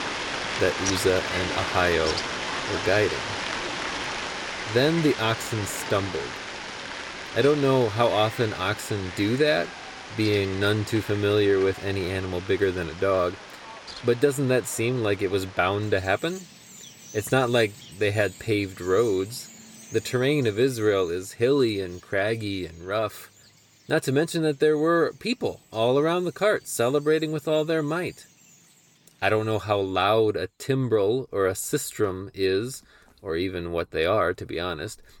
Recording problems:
animal sounds; loud; throughout; 8 dB below the speech

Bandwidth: 18 kHz